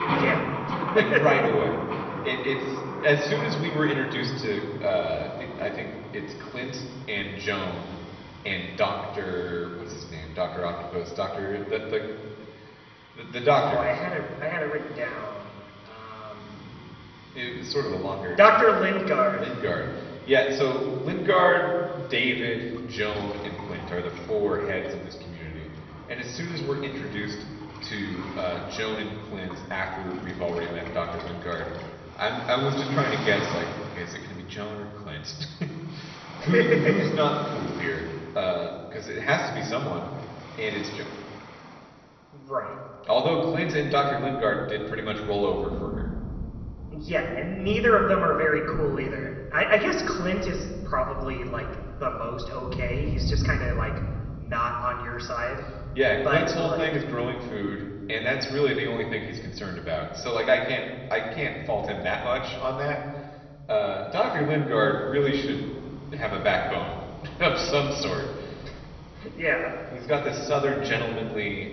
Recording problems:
high frequencies cut off; noticeable; nothing above 6 kHz
room echo; slight; dies away in 1.4 s
off-mic speech; somewhat distant
garbled, watery; slightly
rain or running water; noticeable; throughout; 10 dB below the speech

